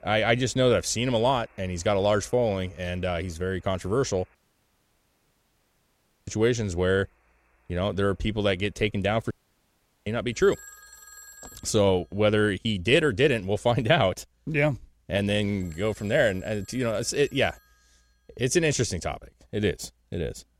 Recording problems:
alarms or sirens; faint; throughout; 25 dB below the speech
audio cutting out; at 4.5 s for 2 s and at 9.5 s for 1 s

